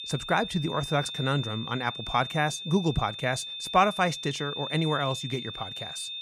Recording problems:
high-pitched whine; loud; throughout; 3.5 kHz, 7 dB below the speech

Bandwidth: 15.5 kHz